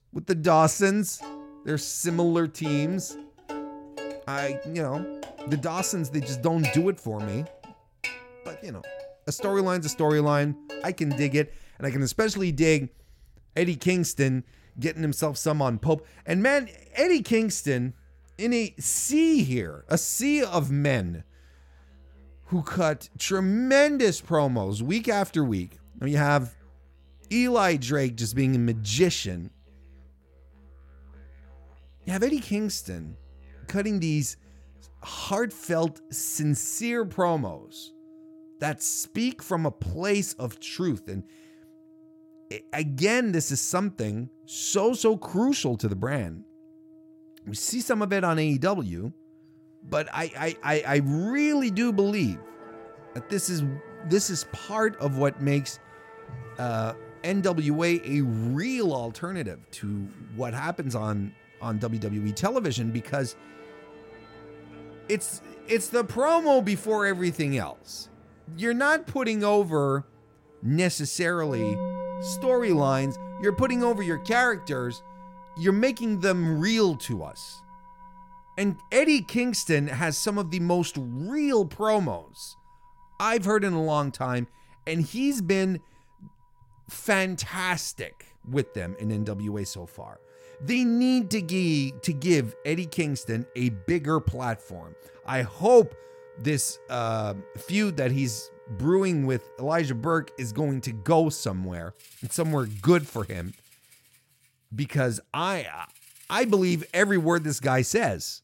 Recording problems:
background music; noticeable; throughout; 20 dB below the speech

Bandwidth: 16.5 kHz